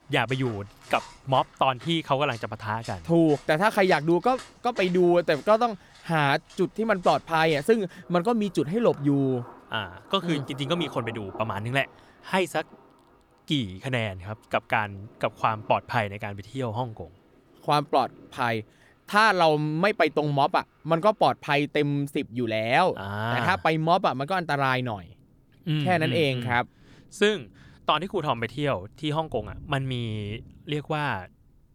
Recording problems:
rain or running water; faint; throughout; 20 dB below the speech

